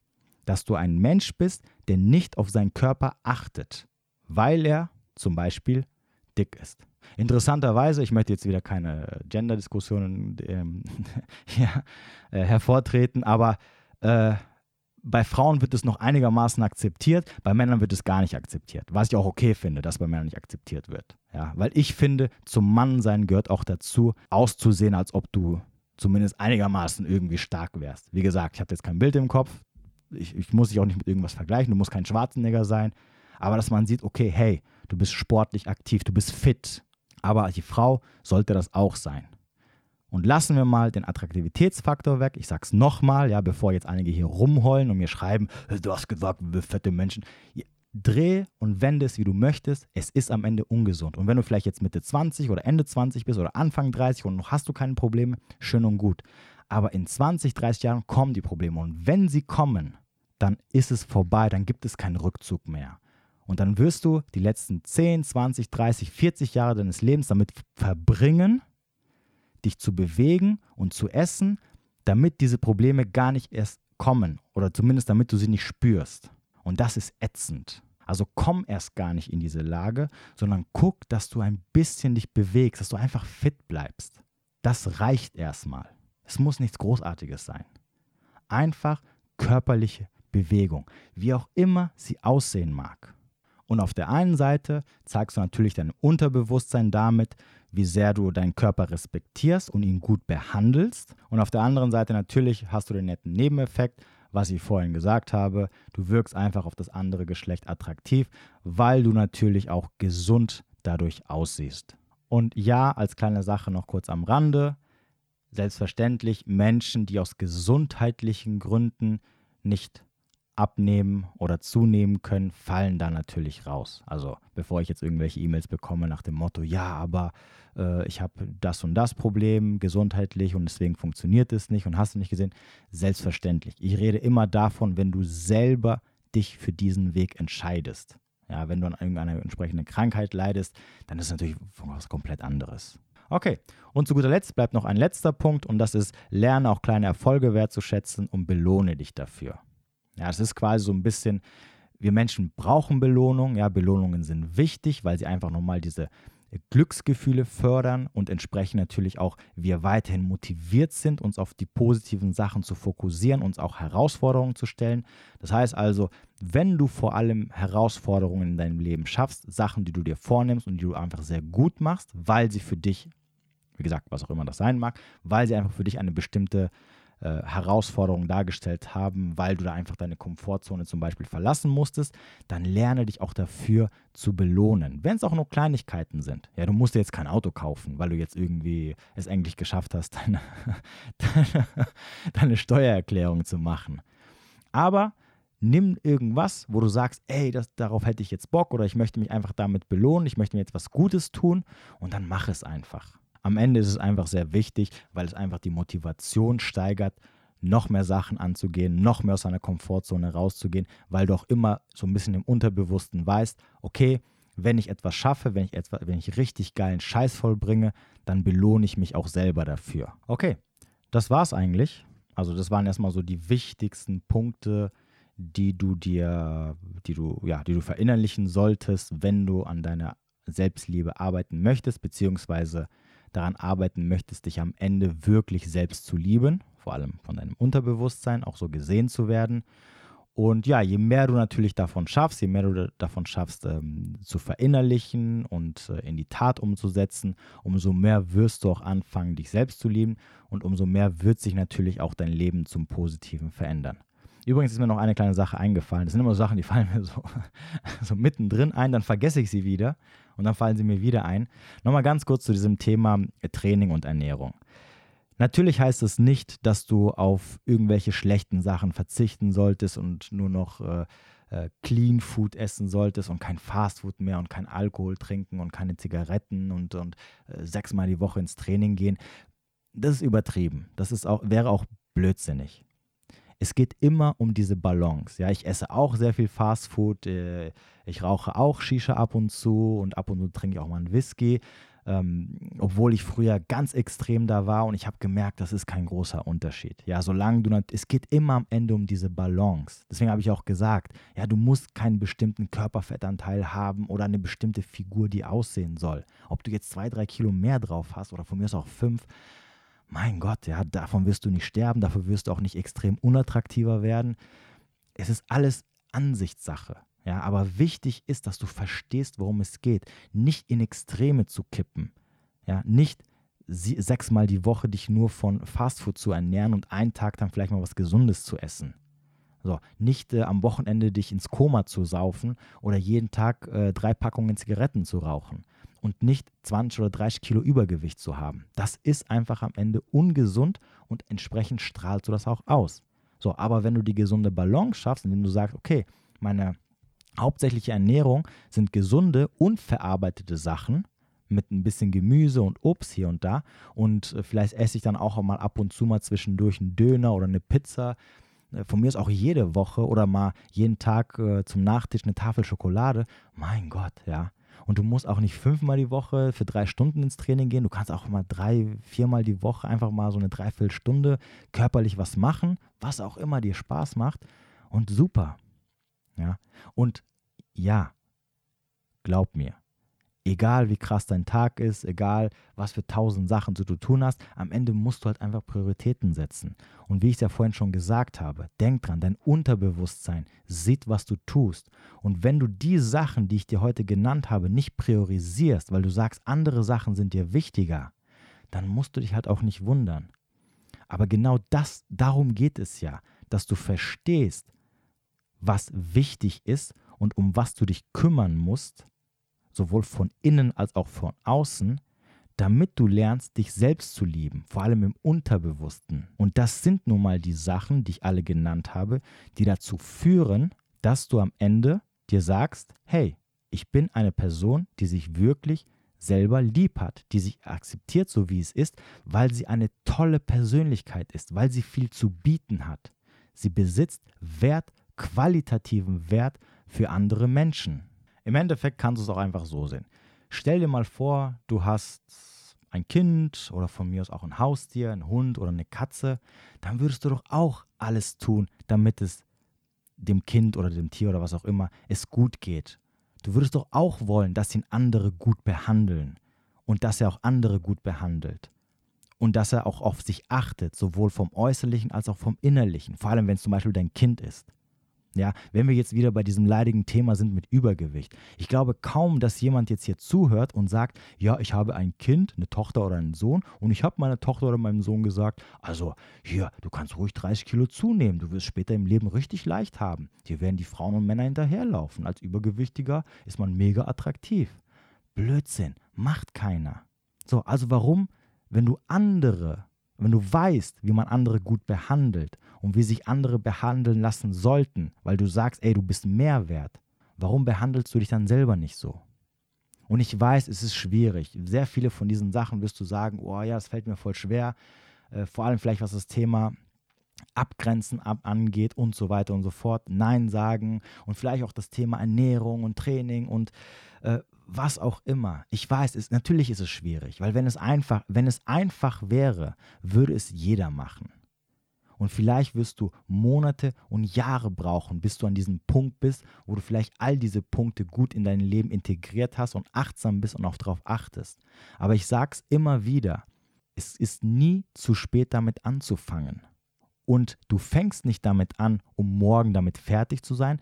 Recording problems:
none

